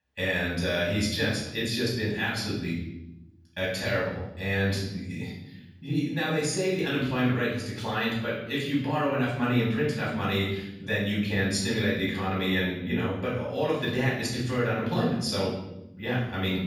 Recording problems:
off-mic speech; far
room echo; noticeable; dies away in 0.9 s

